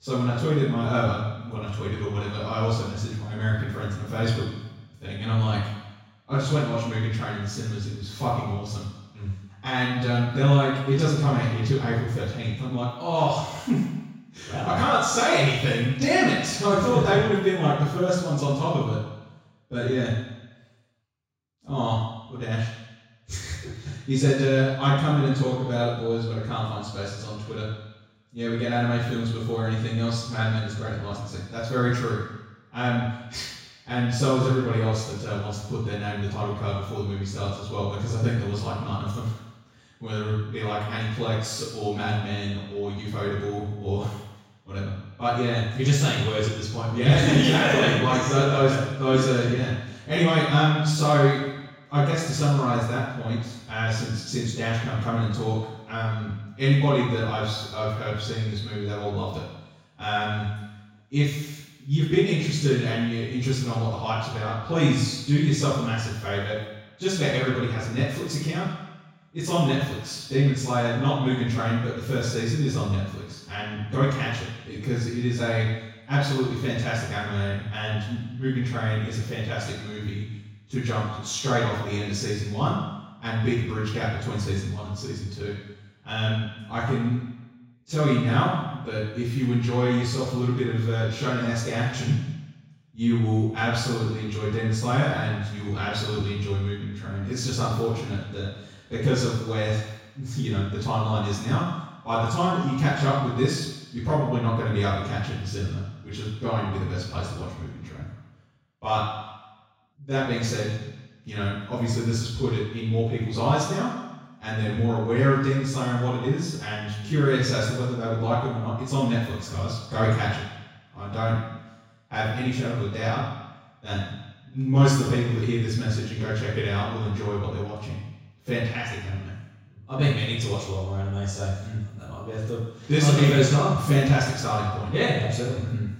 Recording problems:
off-mic speech; far
room echo; noticeable; dies away in 1 s

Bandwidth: 16 kHz